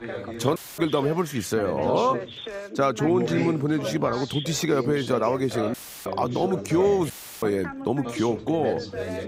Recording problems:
background chatter; loud; throughout; 2 voices, 8 dB below the speech
audio cutting out; filled with static; at 0.5 s, at 5.5 s and at 7 s

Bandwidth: 15.5 kHz